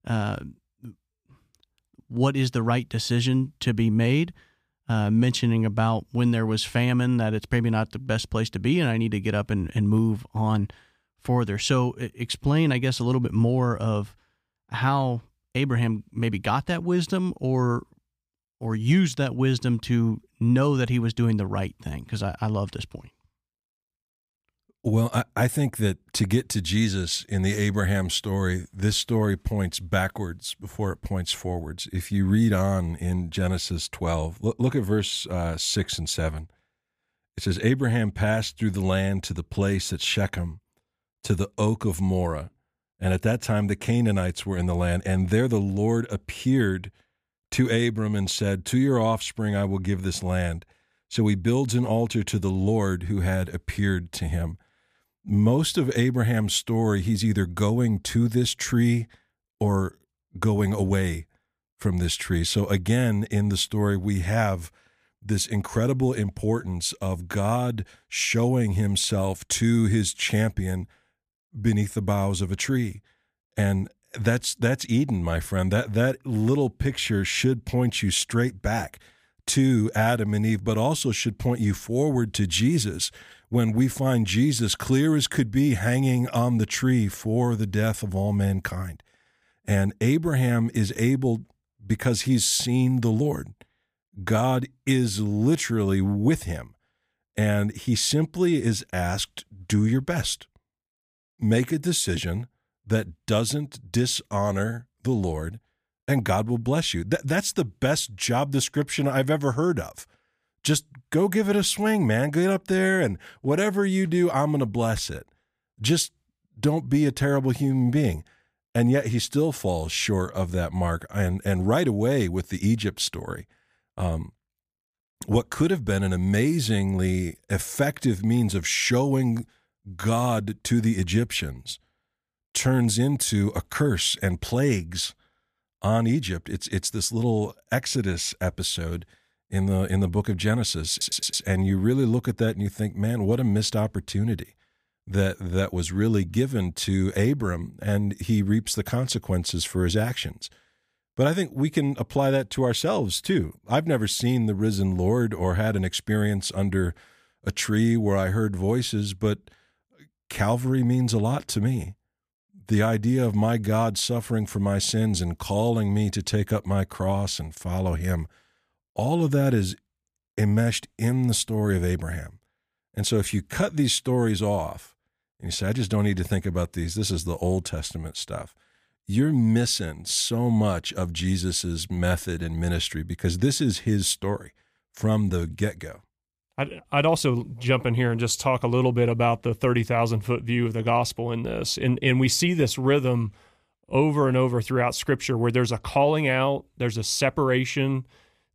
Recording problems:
audio stuttering; at 2:21

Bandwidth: 15 kHz